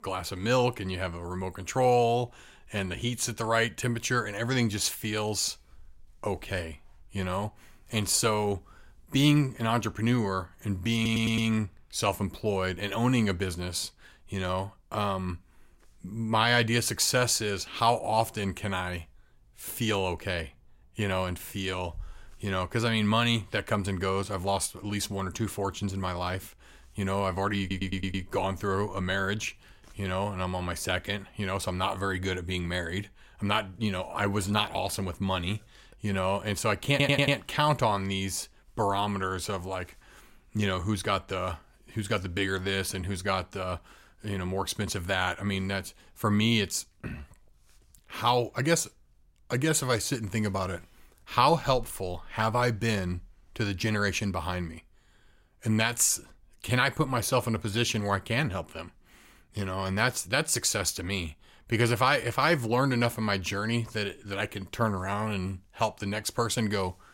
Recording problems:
audio stuttering; at 11 s, at 28 s and at 37 s

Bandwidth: 16 kHz